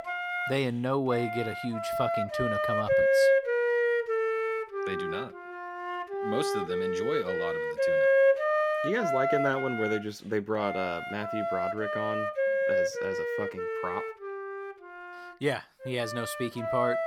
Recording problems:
background music; very loud; throughout; 4 dB above the speech

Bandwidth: 17 kHz